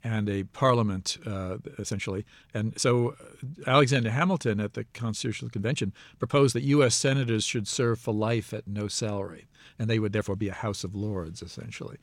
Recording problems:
uneven, jittery; strongly; from 2 to 11 s

